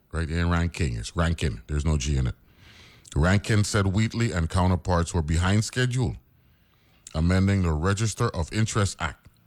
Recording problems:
none

